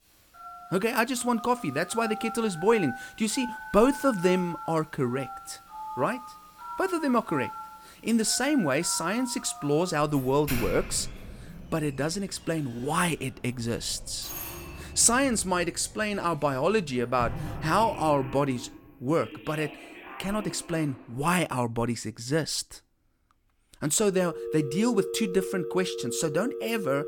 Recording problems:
alarms or sirens; noticeable; throughout; 10 dB below the speech

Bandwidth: 18 kHz